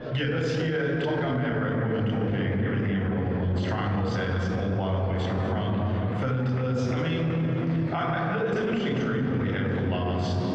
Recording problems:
room echo; strong; dies away in 3 s
off-mic speech; far
muffled; very; fading above 2.5 kHz
squashed, flat; somewhat
murmuring crowd; noticeable; throughout; 15 dB below the speech

